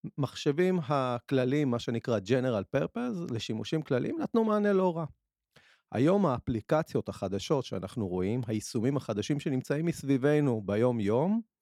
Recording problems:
none

